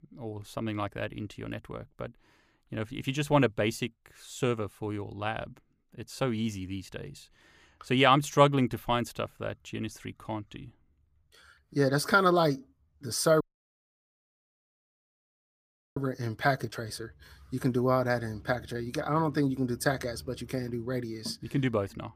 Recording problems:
traffic noise; faint; throughout; 25 dB below the speech
audio cutting out; at 13 s for 2.5 s

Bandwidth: 15 kHz